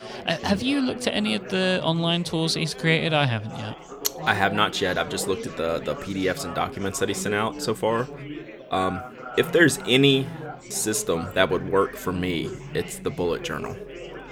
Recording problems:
chatter from many people; noticeable; throughout; 10 dB below the speech

